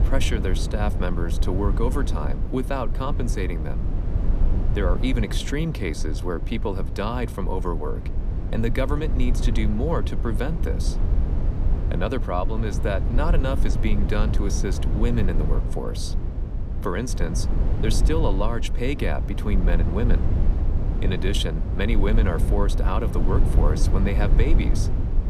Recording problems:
low rumble; loud; throughout; 8 dB below the speech

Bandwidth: 15 kHz